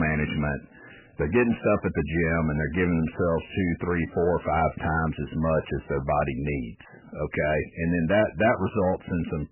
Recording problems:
garbled, watery; badly; nothing above 3 kHz
distortion; slight; 10 dB below the speech
abrupt cut into speech; at the start

